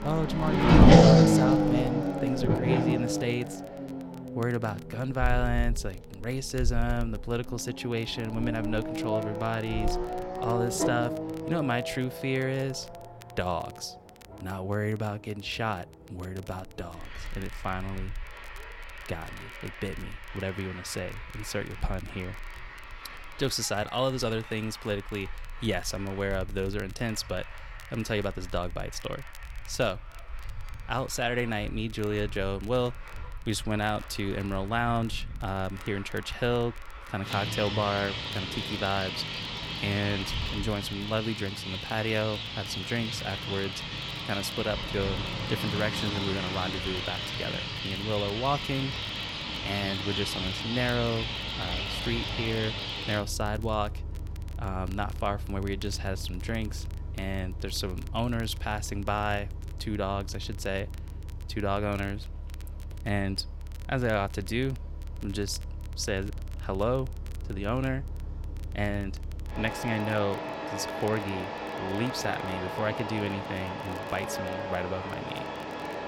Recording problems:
traffic noise; very loud; throughout; 1 dB above the speech
crackle, like an old record; faint; 25 dB below the speech

